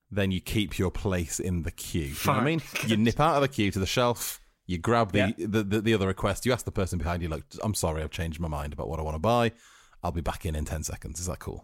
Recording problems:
none

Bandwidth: 16 kHz